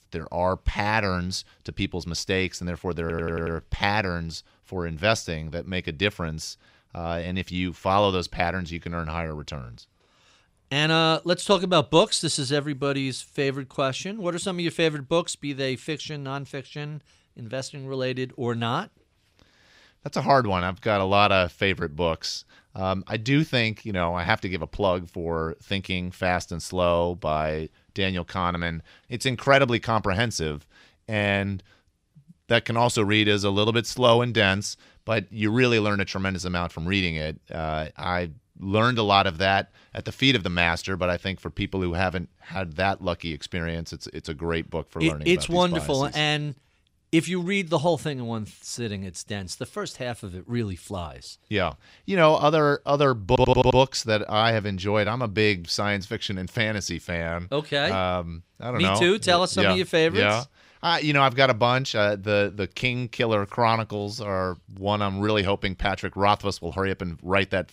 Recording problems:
audio stuttering; at 3 s and at 53 s

